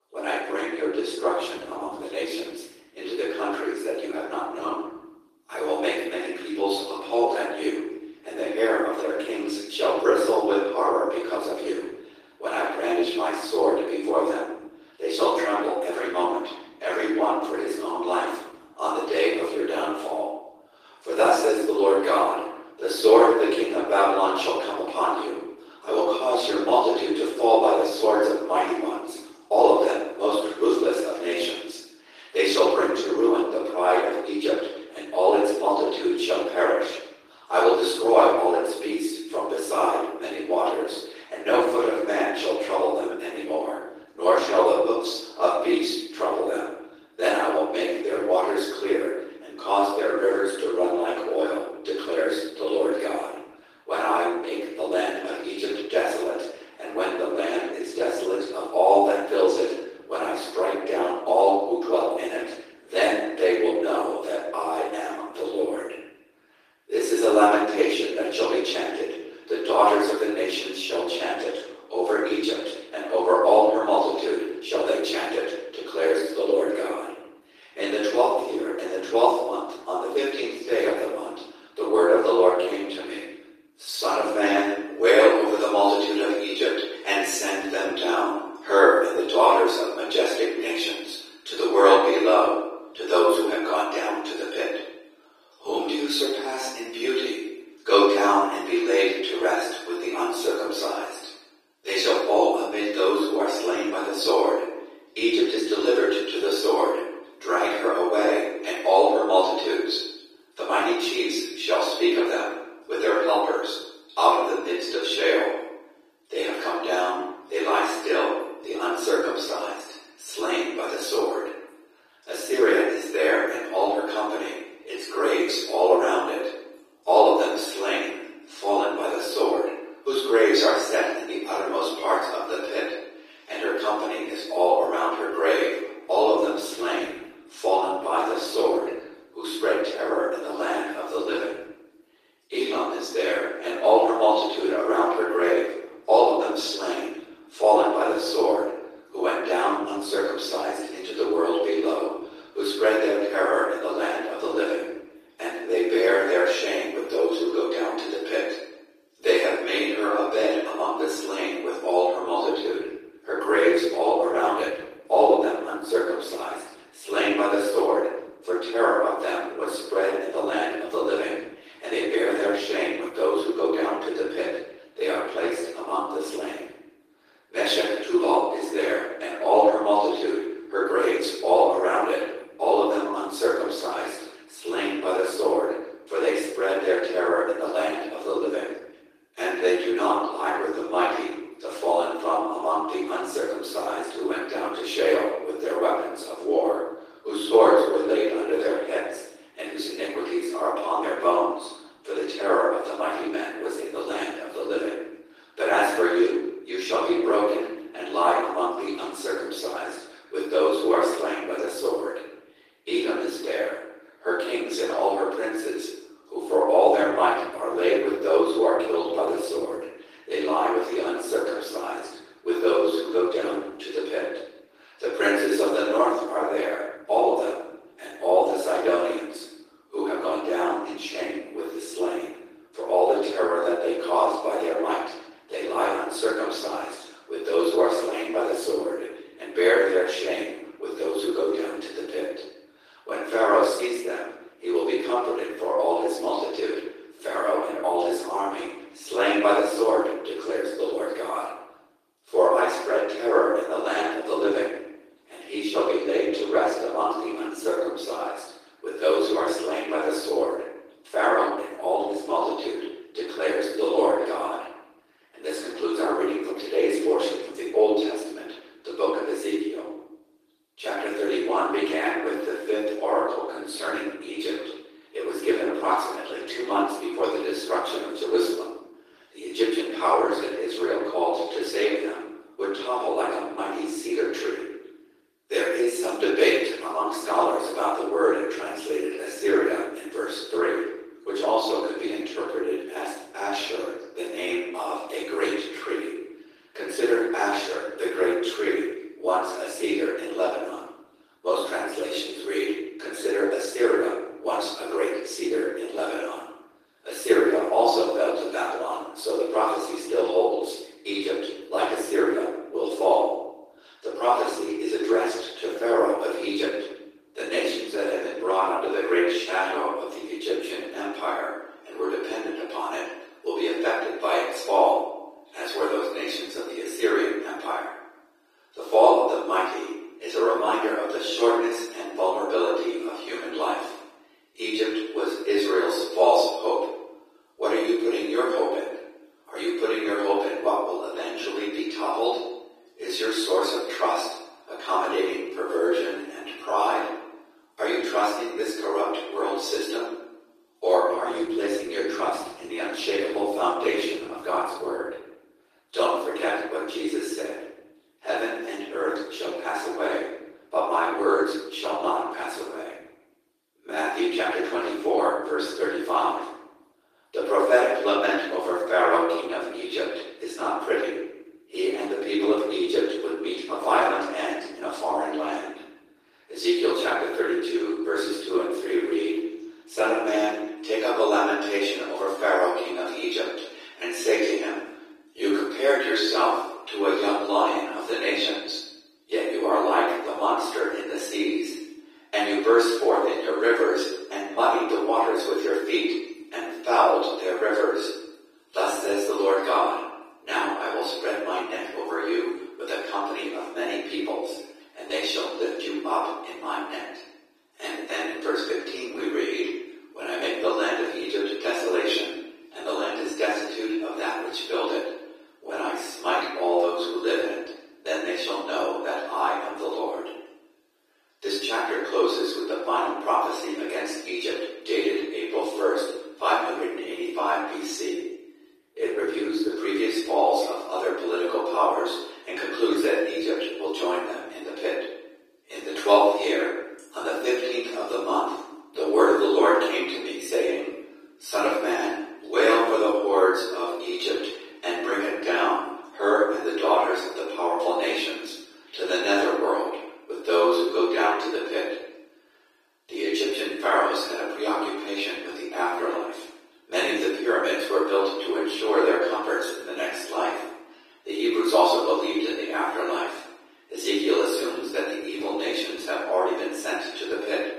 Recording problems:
room echo; strong; dies away in 0.9 s
off-mic speech; far
thin; very; fading below 300 Hz
garbled, watery; slightly; nothing above 14.5 kHz

